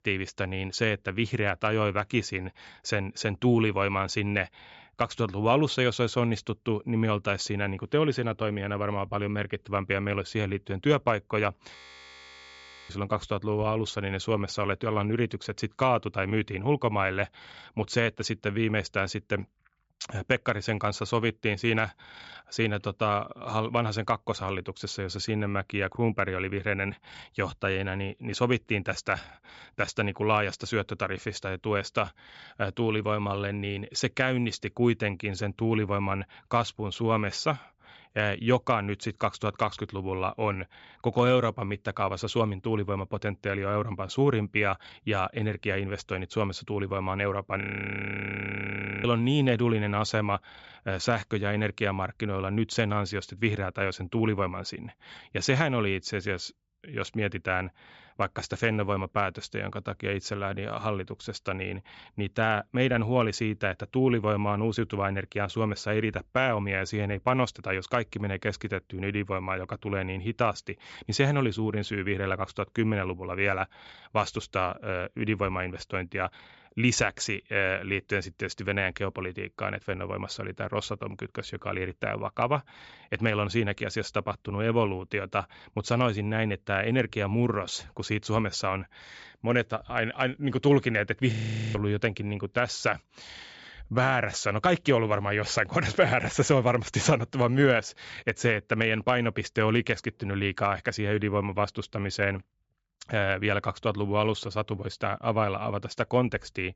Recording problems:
high frequencies cut off; noticeable; nothing above 8 kHz
audio freezing; at 12 s for 1 s, at 48 s for 1.5 s and at 1:31

